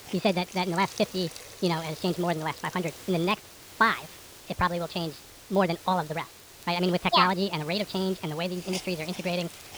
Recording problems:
wrong speed and pitch; too fast and too high; 1.5 times normal speed
high frequencies cut off; noticeable; nothing above 5.5 kHz
hiss; noticeable; throughout; 15 dB below the speech
crackle, like an old record; faint; 30 dB below the speech

